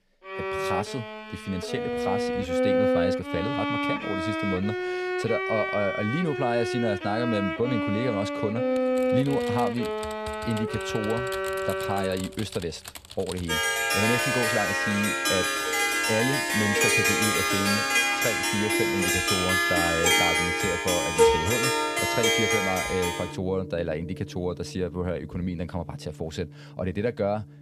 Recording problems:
background music; very loud; throughout; 5 dB above the speech
keyboard typing; noticeable; from 9 to 14 s; peak 9 dB below the speech

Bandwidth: 14.5 kHz